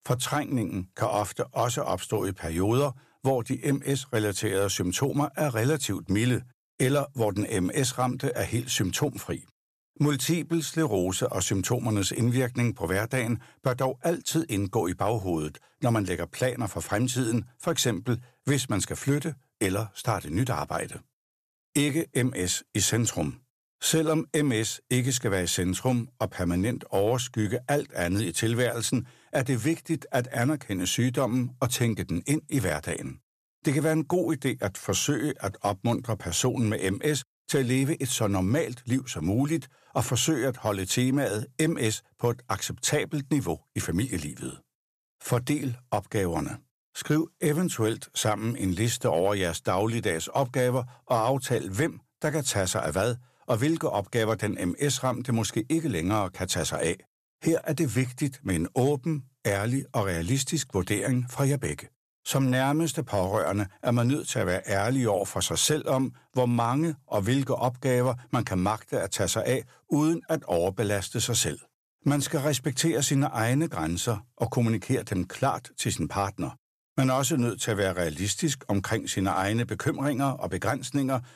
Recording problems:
none

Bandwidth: 14.5 kHz